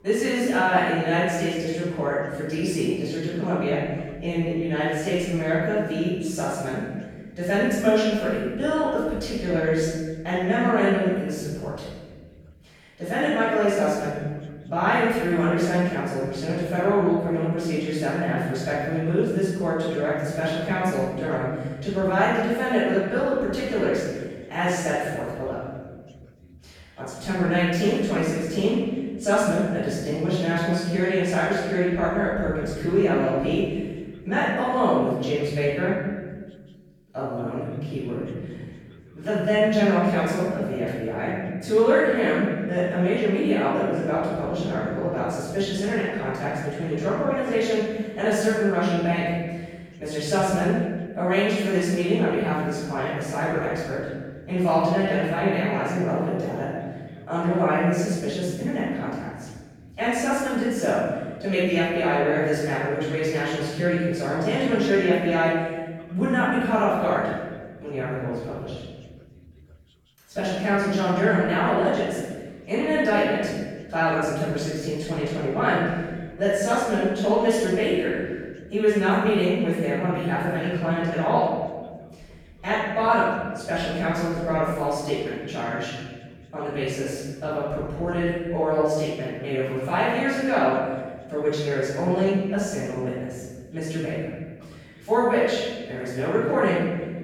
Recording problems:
room echo; strong; dies away in 1.5 s
off-mic speech; far
voice in the background; faint; throughout; 30 dB below the speech

